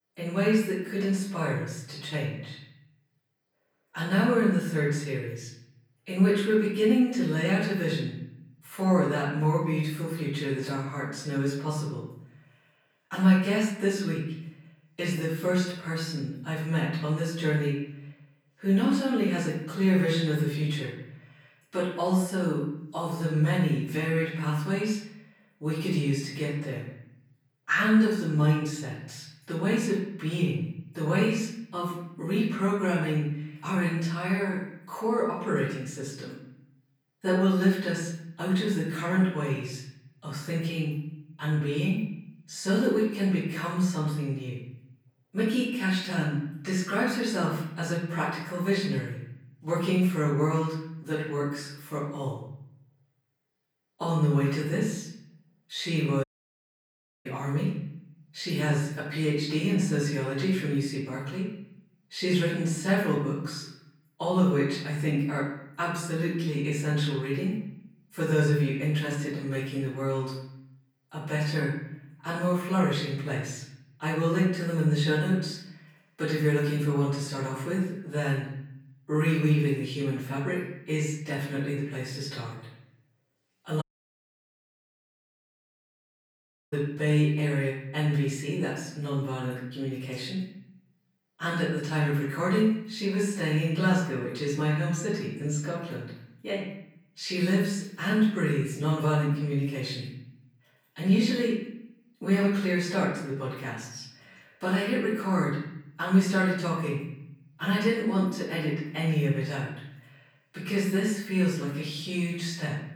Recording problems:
off-mic speech; far
room echo; noticeable; dies away in 0.8 s
audio cutting out; at 56 s for 1 s and at 1:24 for 3 s

